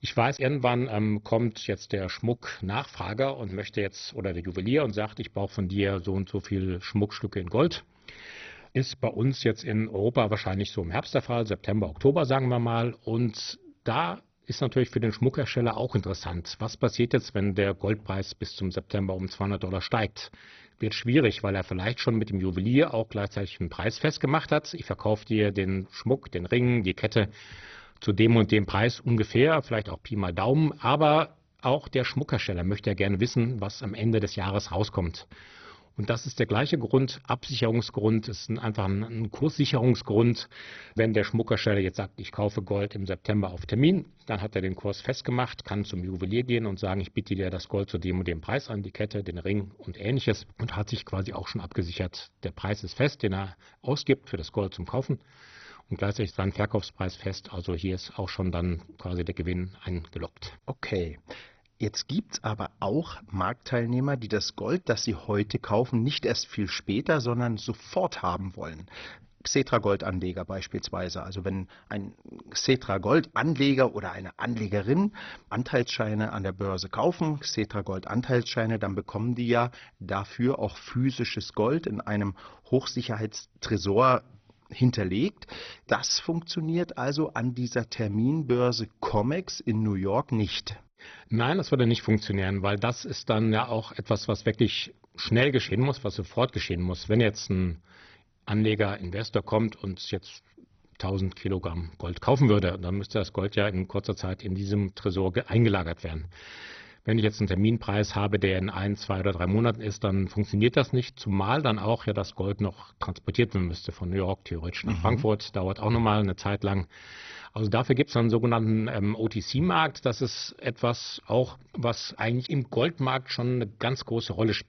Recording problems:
garbled, watery; badly; nothing above 6 kHz

